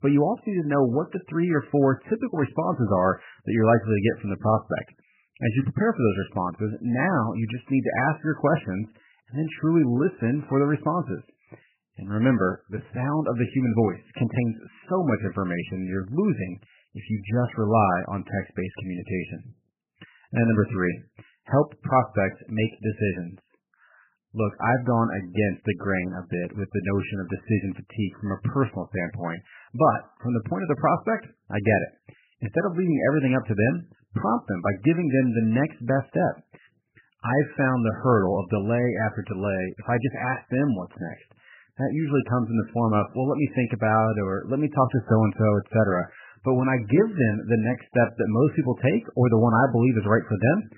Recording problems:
garbled, watery; badly; nothing above 3 kHz

